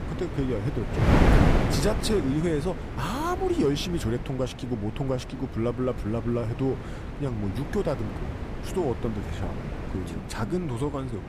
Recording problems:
wind noise on the microphone; heavy; 3 dB below the speech

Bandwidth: 15 kHz